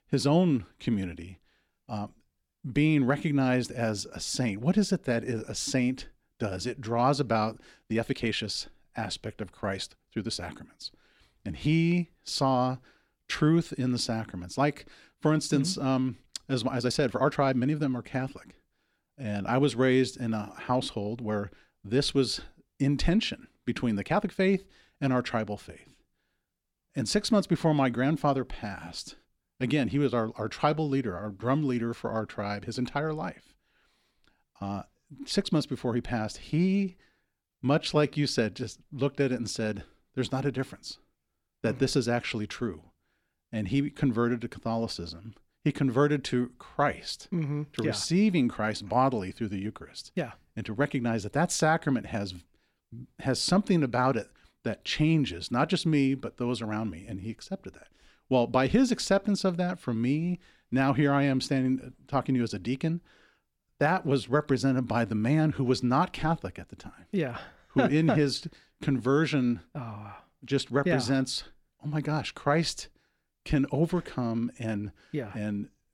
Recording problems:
uneven, jittery; strongly; from 7.5 to 38 s

